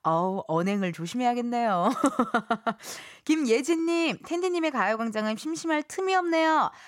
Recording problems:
none

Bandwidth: 16.5 kHz